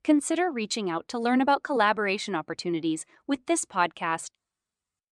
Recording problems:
none

